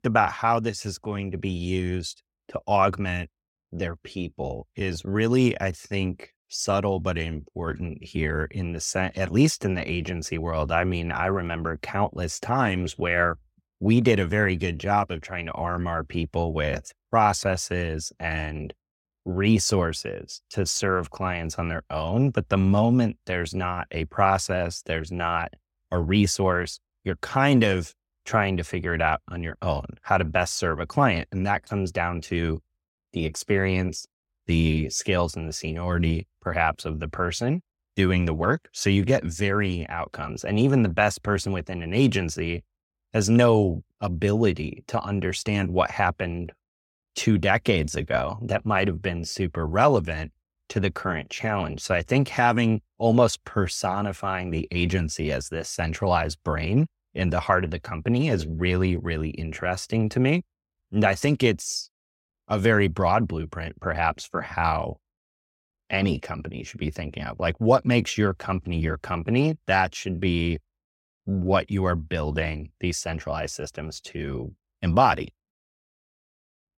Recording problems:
none

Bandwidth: 16 kHz